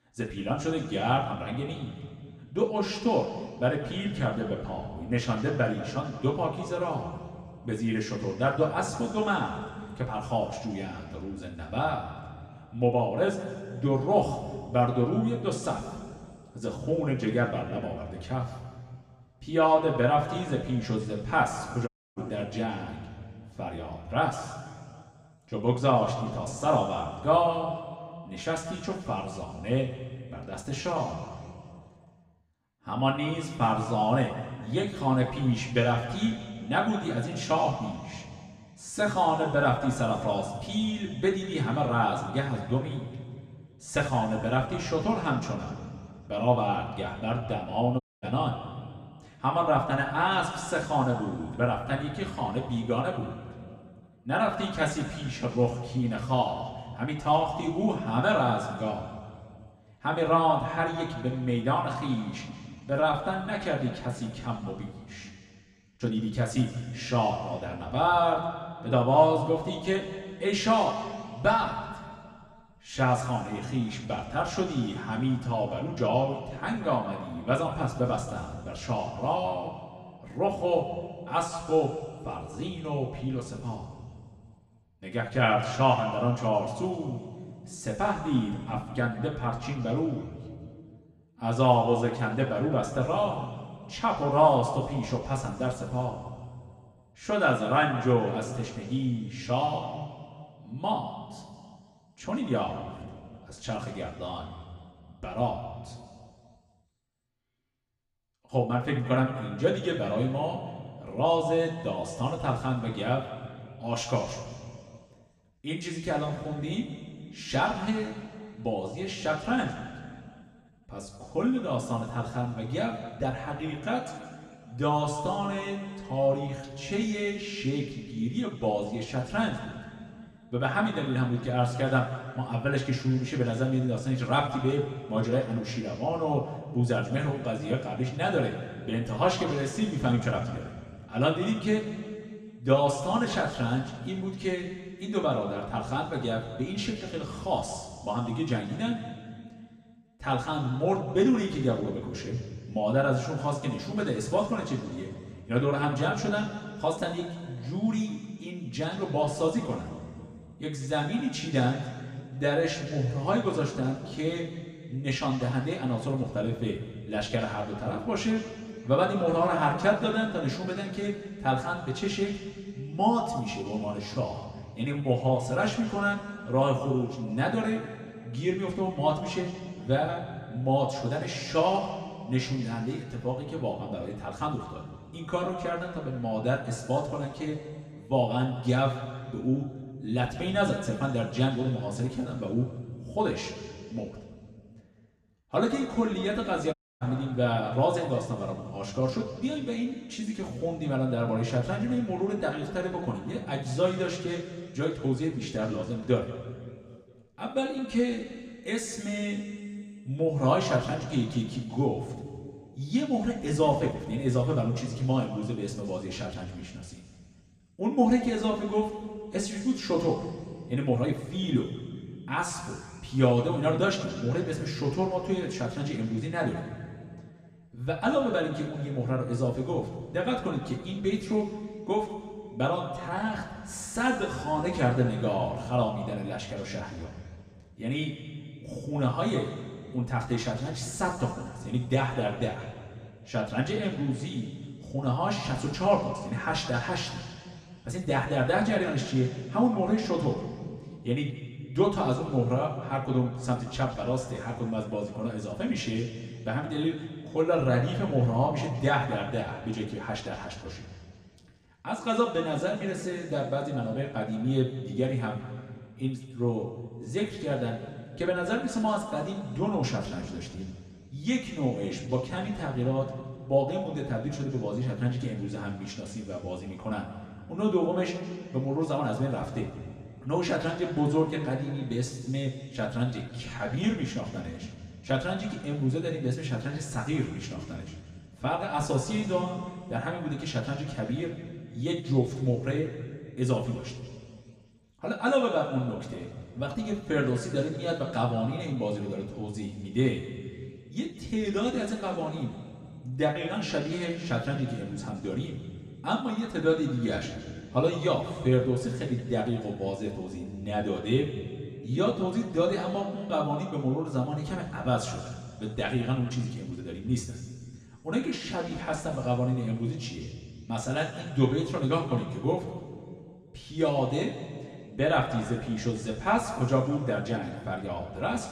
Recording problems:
room echo; noticeable; dies away in 2 s
off-mic speech; somewhat distant
uneven, jittery; strongly; from 1 s to 5:17
audio cutting out; at 22 s, at 48 s and at 3:17

